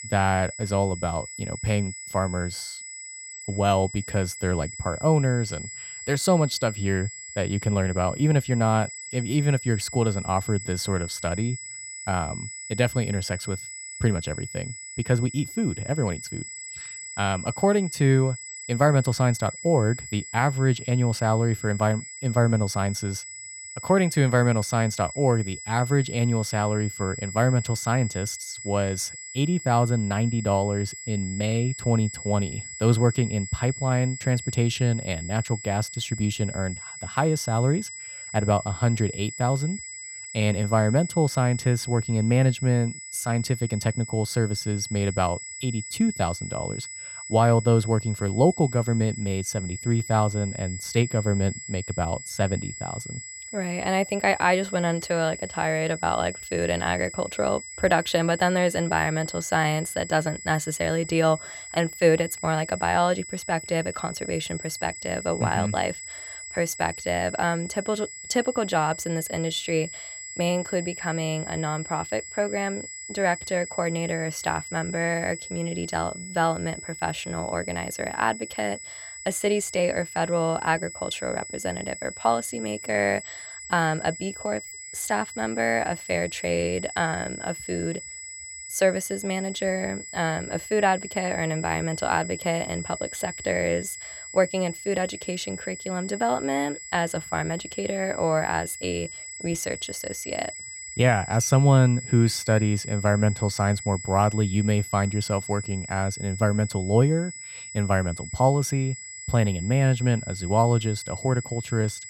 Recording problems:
high-pitched whine; noticeable; throughout; 7.5 kHz, 10 dB below the speech

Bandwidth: 16 kHz